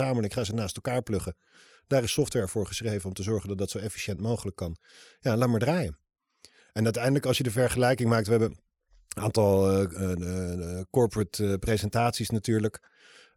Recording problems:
abrupt cut into speech; at the start

